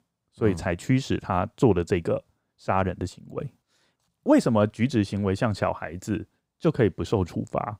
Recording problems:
none

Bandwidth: 15.5 kHz